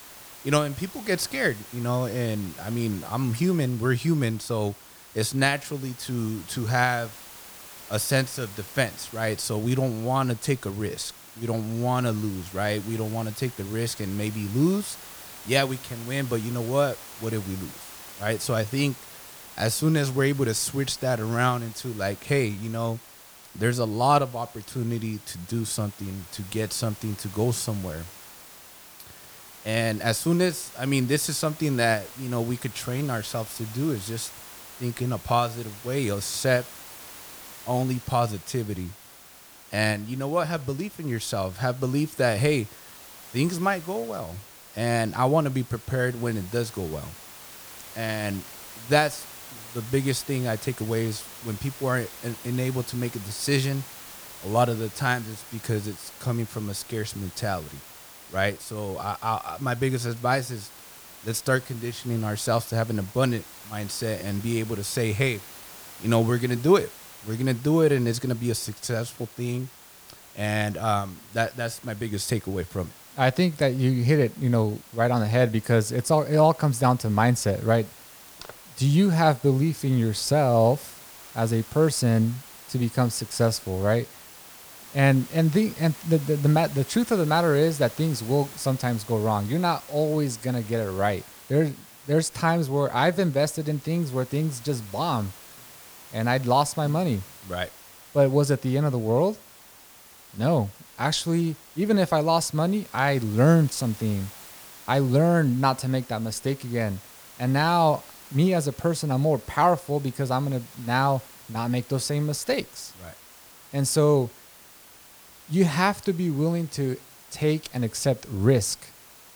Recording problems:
hiss; noticeable; throughout; 15 dB below the speech

